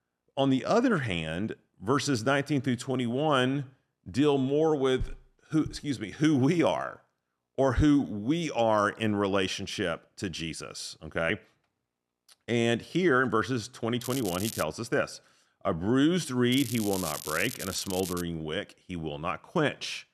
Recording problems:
crackling; loud; at 14 s and from 17 to 18 s; 9 dB below the speech

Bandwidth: 13.5 kHz